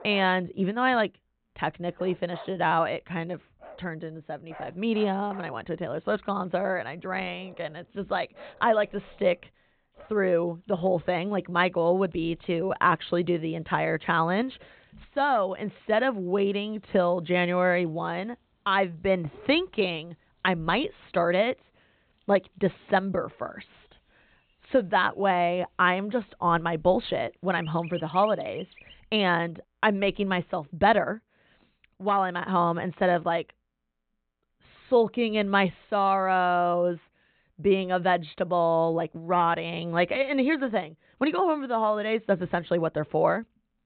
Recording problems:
high frequencies cut off; severe; nothing above 4 kHz
animal sounds; faint; until 29 s; 20 dB below the speech

